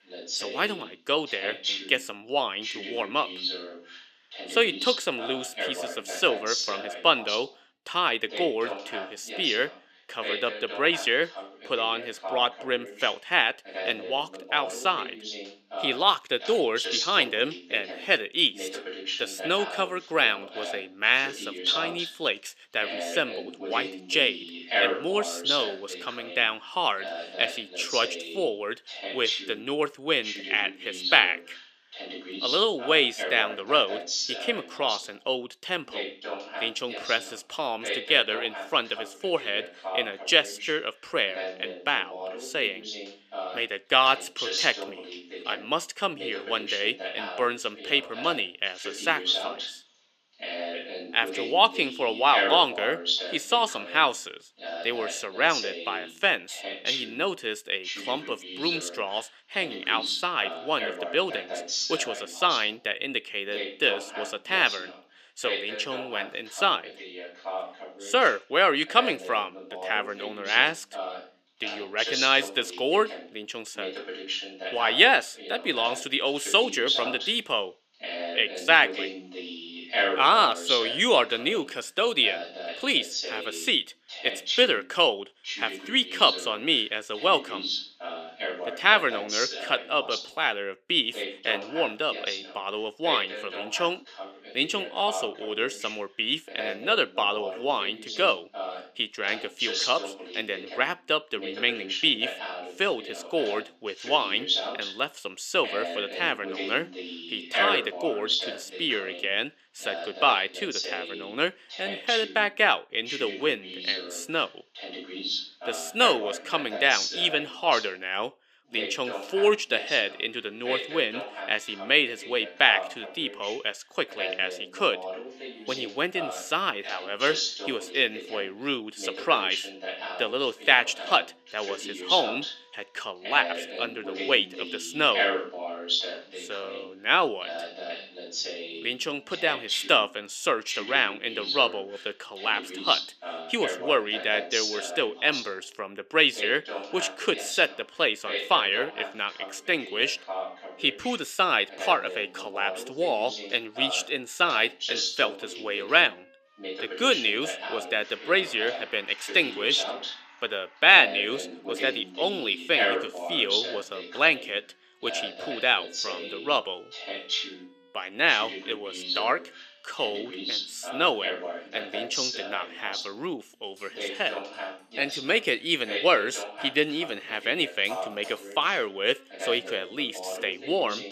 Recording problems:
thin; very slightly; fading below 300 Hz
voice in the background; loud; throughout; 8 dB below the speech
background music; faint; from 2:00 on; 30 dB below the speech

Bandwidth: 14.5 kHz